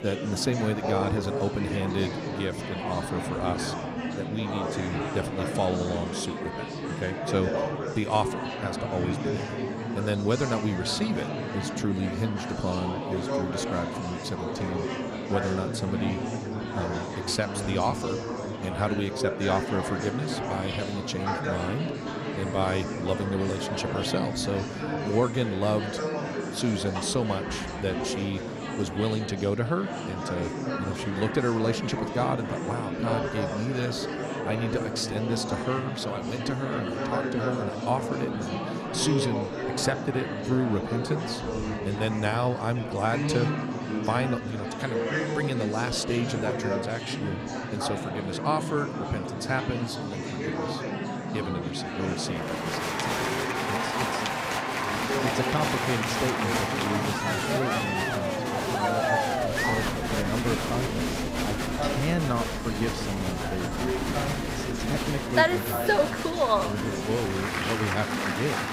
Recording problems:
murmuring crowd; very loud; throughout; 1 dB above the speech

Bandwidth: 15.5 kHz